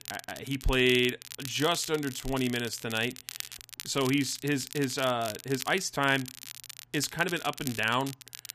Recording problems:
crackle, like an old record; noticeable; 10 dB below the speech

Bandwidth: 14.5 kHz